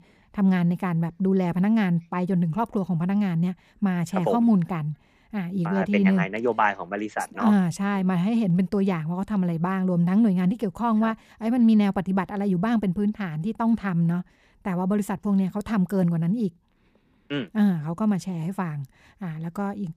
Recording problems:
none

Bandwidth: 15 kHz